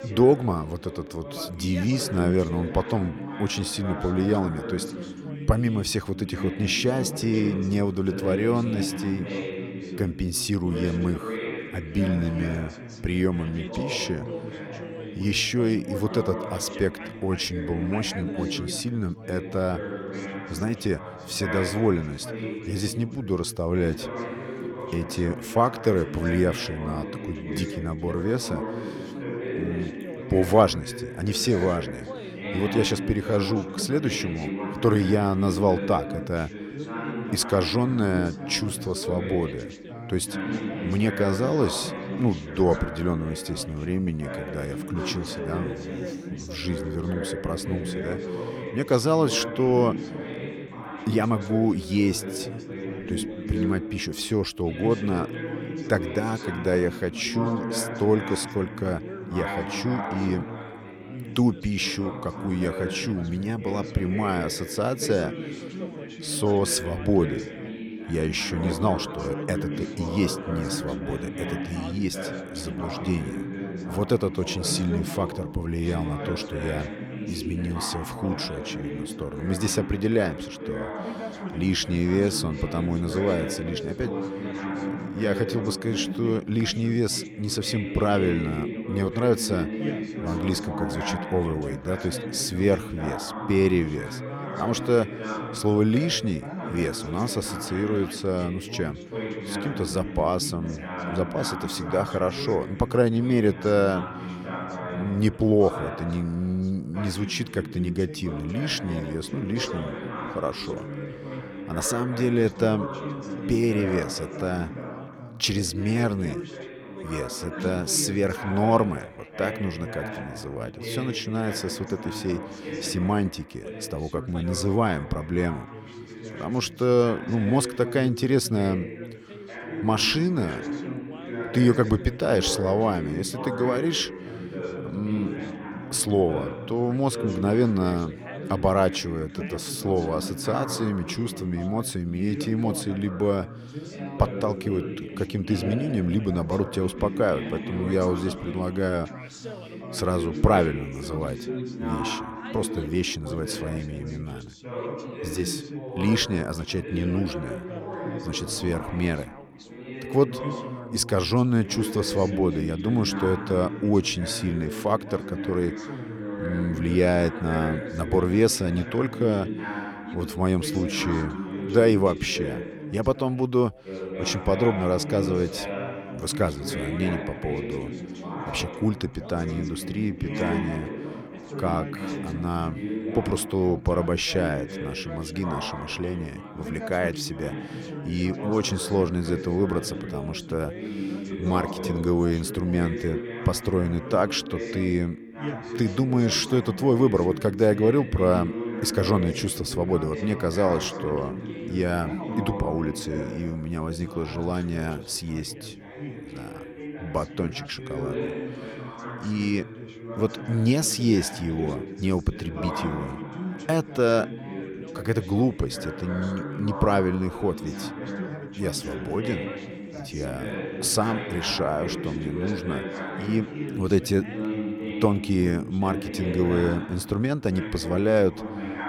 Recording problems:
background chatter; loud; throughout; 3 voices, 8 dB below the speech

